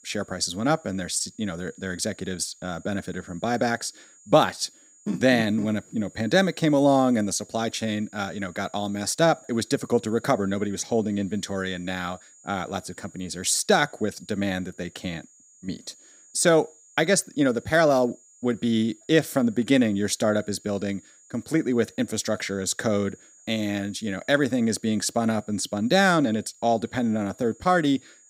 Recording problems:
high-pitched whine; faint; throughout; 7 kHz, 25 dB below the speech

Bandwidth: 15.5 kHz